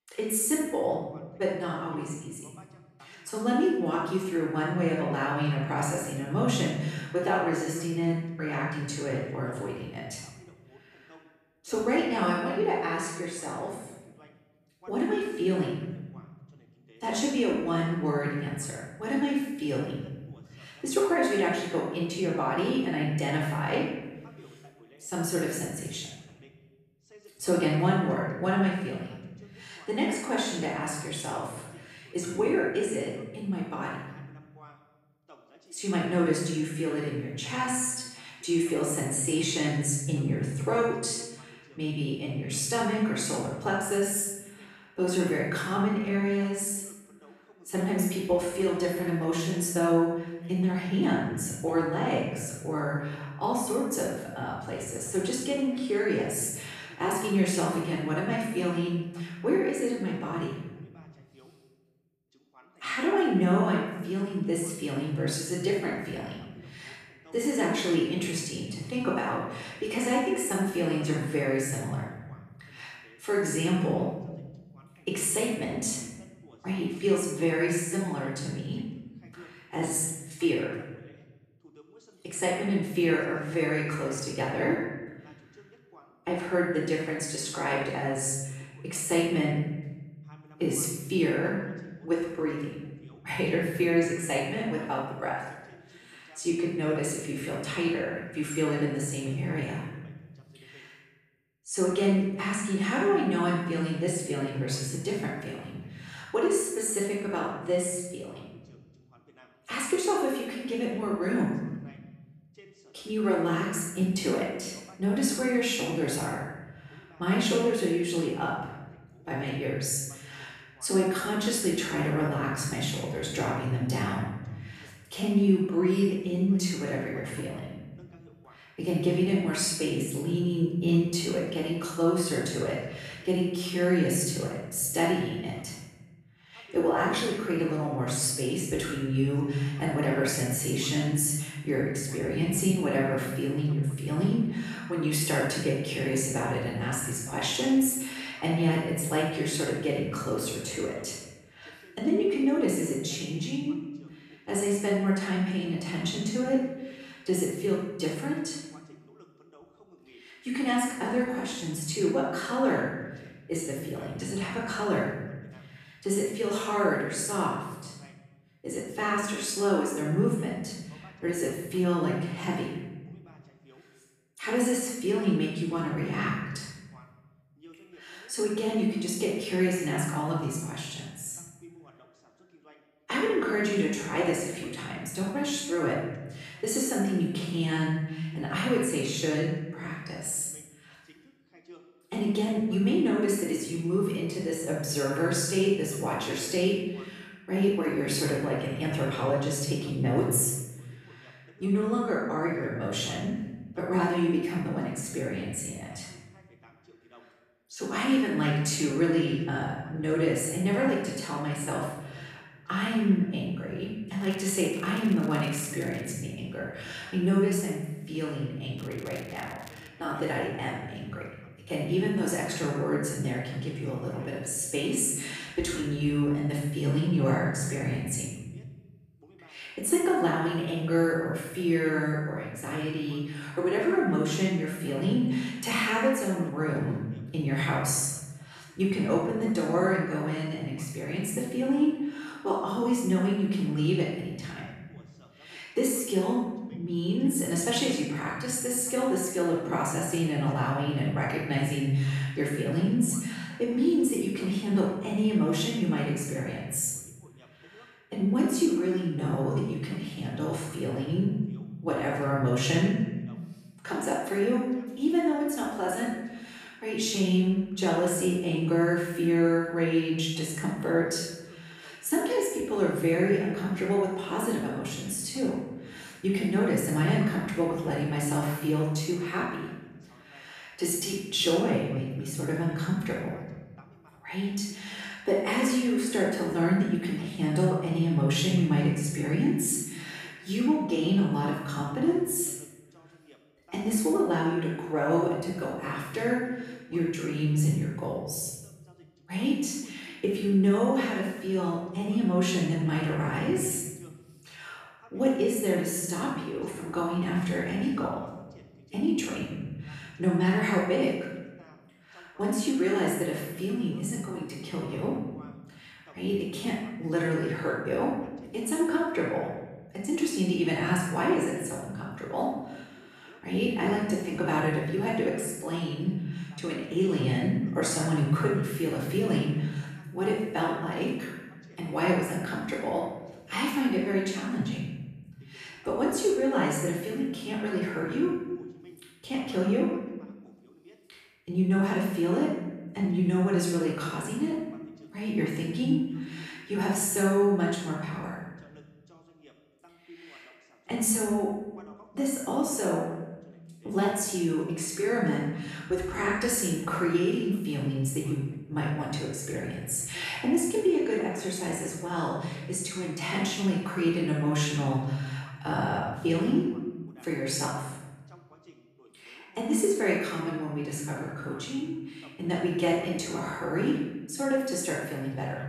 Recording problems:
off-mic speech; far
room echo; noticeable; dies away in 1.2 s
voice in the background; faint; throughout; 30 dB below the speech
crackling; faint; from 3:34 to 3:36 and from 3:39 to 3:40; 20 dB below the speech

